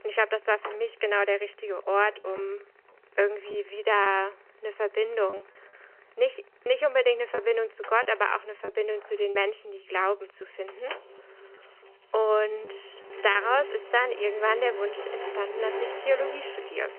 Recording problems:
phone-call audio
traffic noise; noticeable; throughout; 10 dB below the speech
household noises; faint; throughout; 20 dB below the speech
choppy; occasionally; from 5.5 to 9.5 s; 5% of the speech affected

